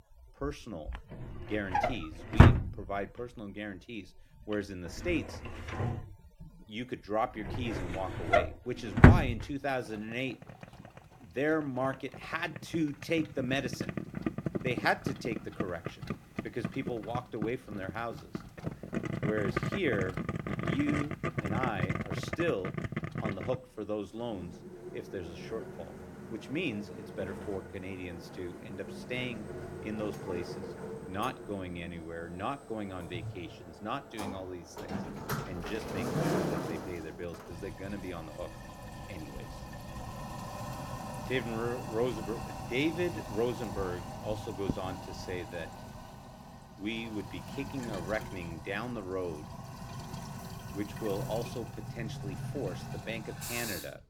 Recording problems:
household noises; very loud; throughout; 2 dB above the speech

